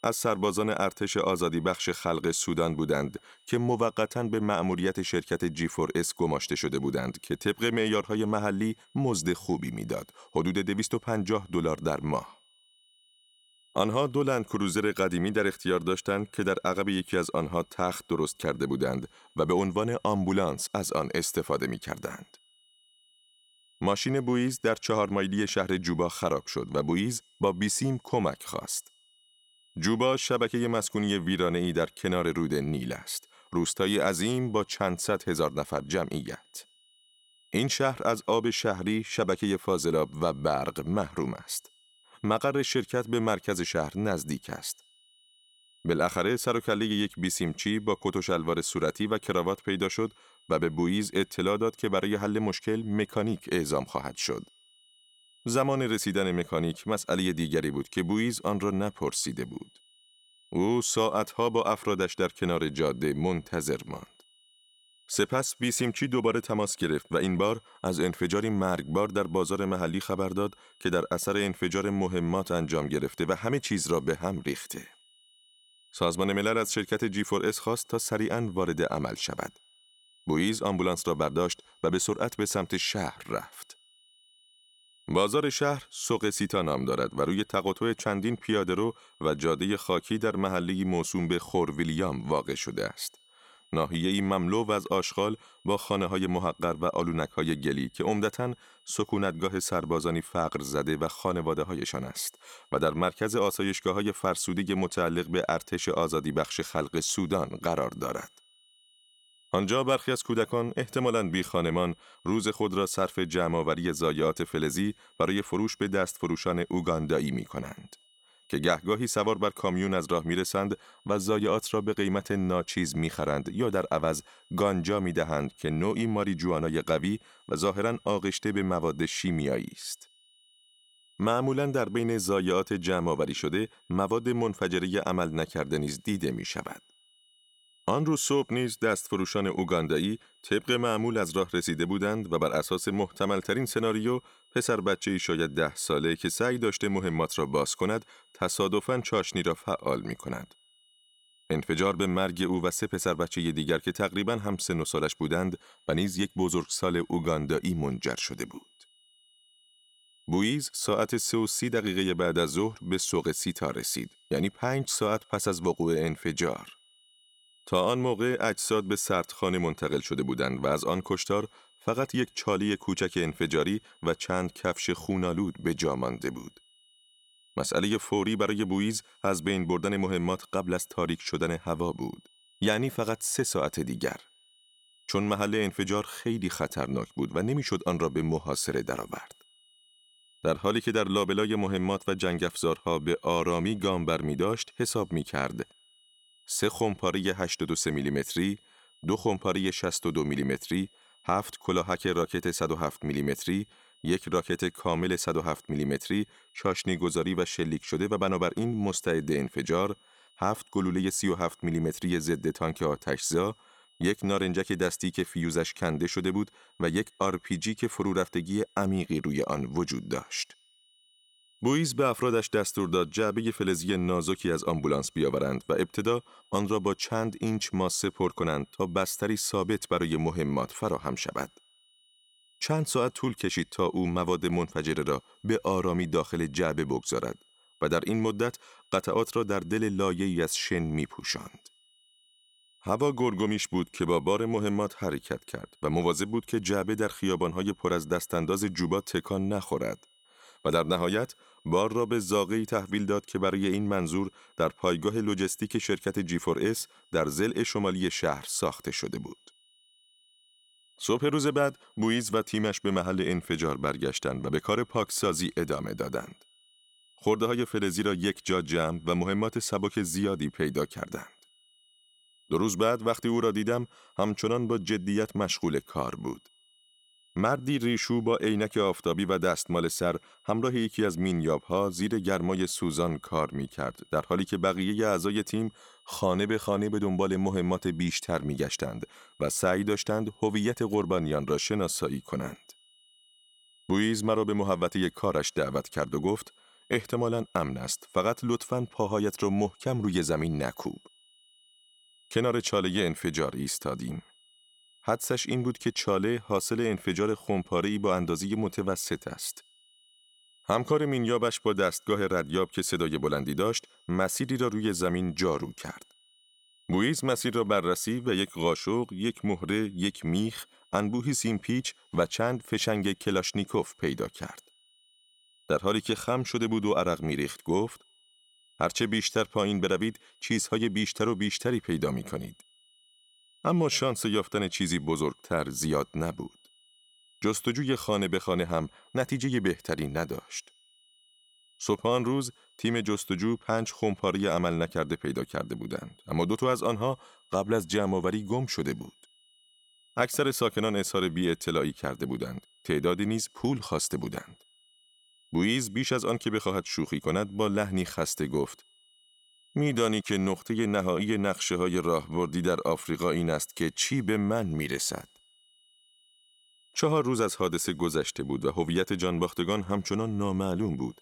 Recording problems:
high-pitched whine; faint; throughout; 3 kHz, 30 dB below the speech

